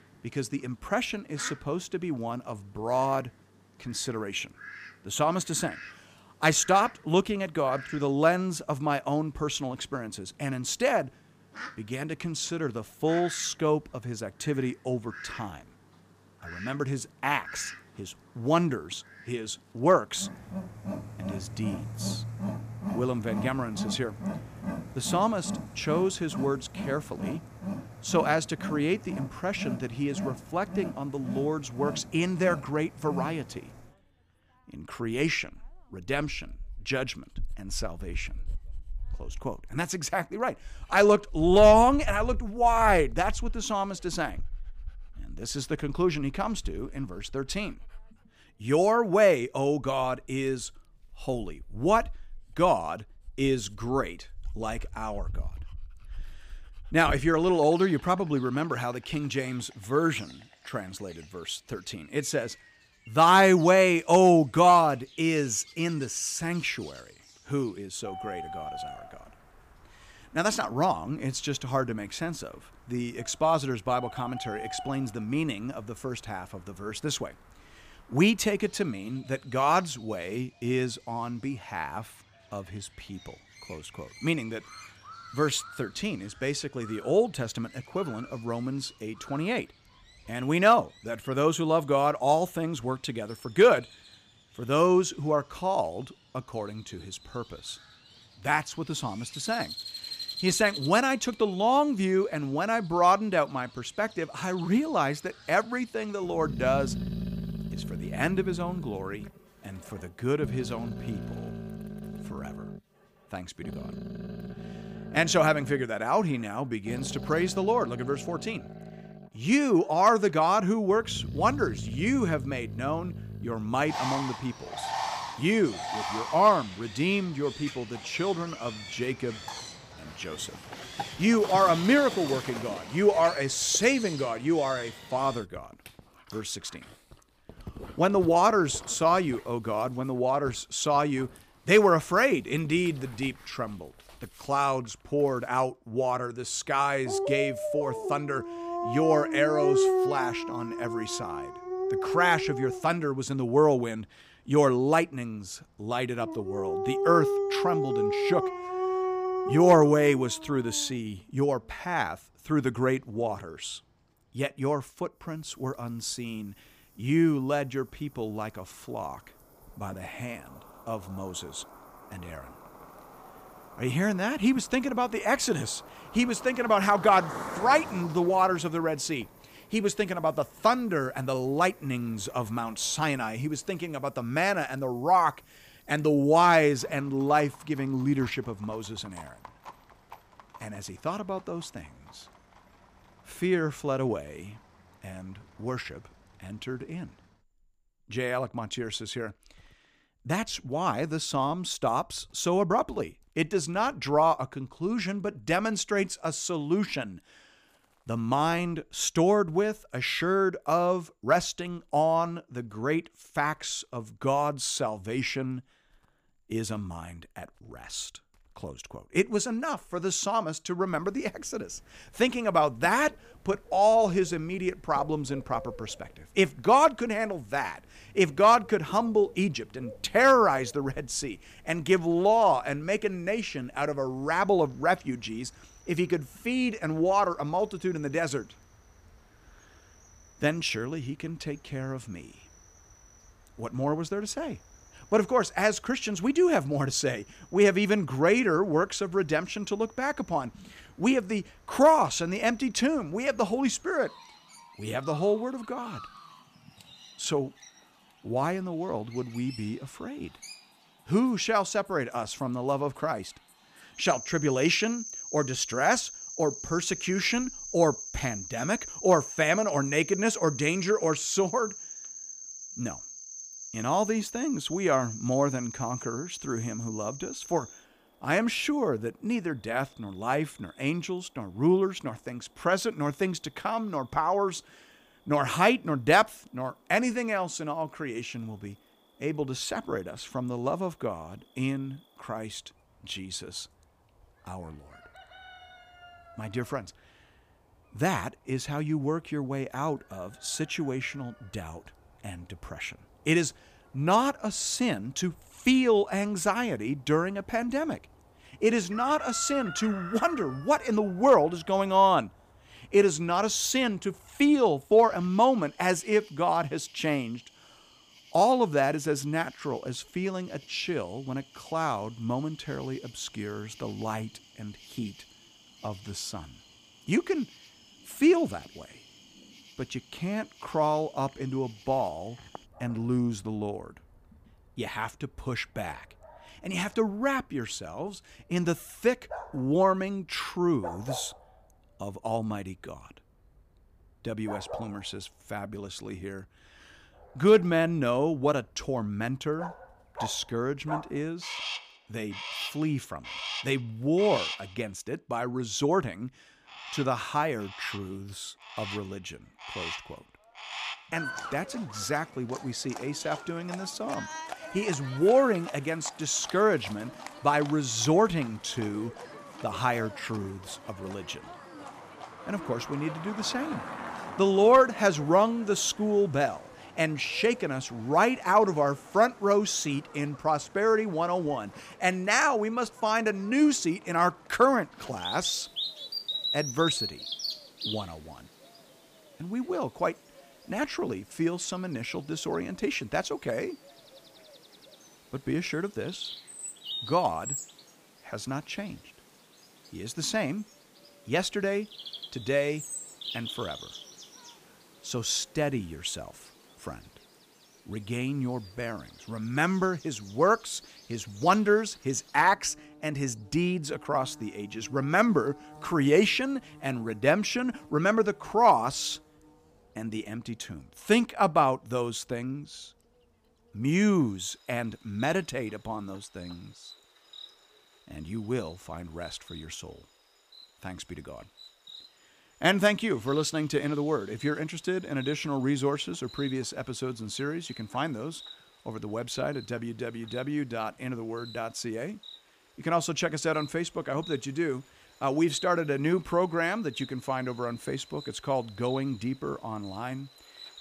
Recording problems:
animal sounds; noticeable; throughout; 10 dB below the speech

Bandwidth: 15 kHz